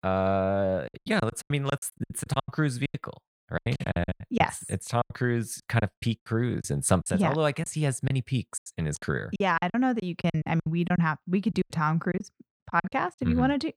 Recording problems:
choppy; very; 15% of the speech affected

